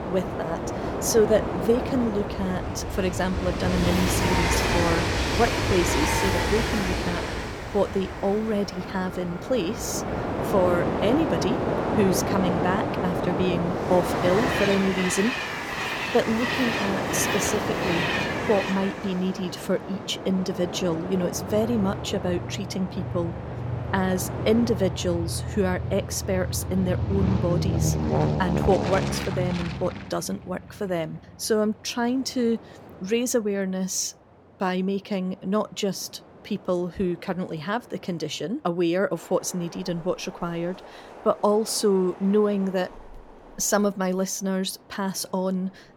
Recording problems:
train or aircraft noise; loud; throughout; 1 dB below the speech

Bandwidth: 17.5 kHz